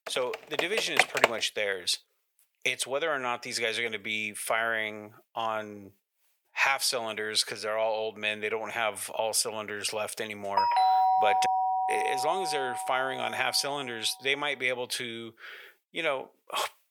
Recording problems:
thin; very; fading below 450 Hz
keyboard typing; loud; until 1.5 s; peak 6 dB above the speech
doorbell; loud; from 11 to 13 s; peak 7 dB above the speech

